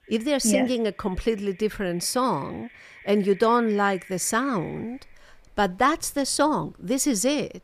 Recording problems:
animal sounds; faint; throughout; 25 dB below the speech

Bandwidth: 15 kHz